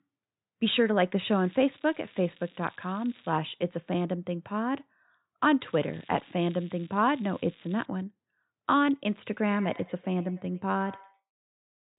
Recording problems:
high frequencies cut off; severe; nothing above 4 kHz
echo of what is said; faint; from 9.5 s on; 100 ms later, 20 dB below the speech
crackling; faint; from 1 to 3.5 s and from 5.5 to 8 s; 25 dB below the speech

